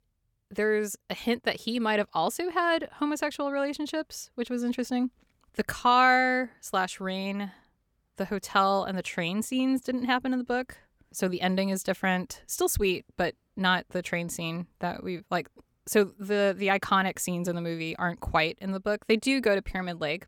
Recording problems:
none

